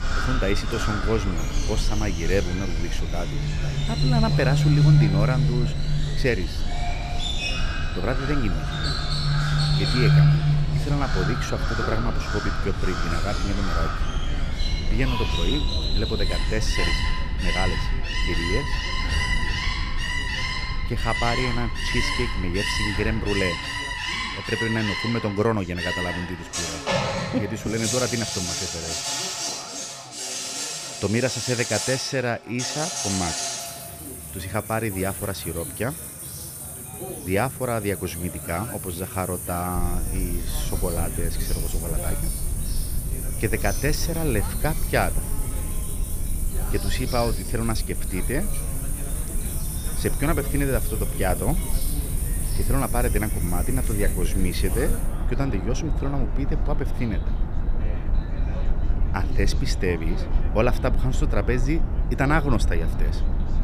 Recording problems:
animal sounds; loud; throughout; as loud as the speech
chatter from many people; noticeable; throughout; 15 dB below the speech
low rumble; noticeable; until 23 s and from 40 s on; 15 dB below the speech

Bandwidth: 15 kHz